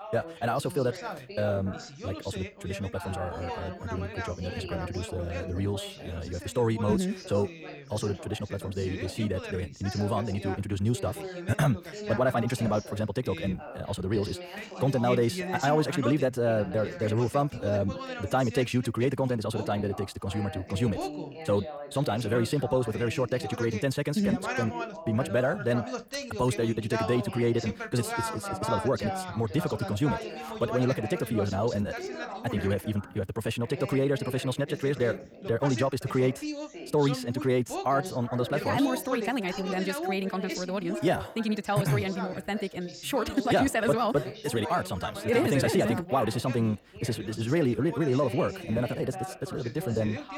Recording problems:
wrong speed, natural pitch; too fast; 1.7 times normal speed
background chatter; loud; throughout; 2 voices, 9 dB below the speech

